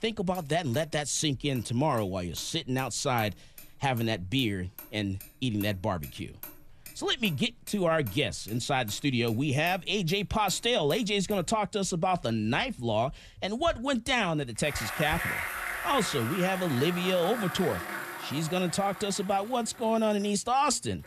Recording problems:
traffic noise; noticeable; throughout; 10 dB below the speech

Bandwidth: 14 kHz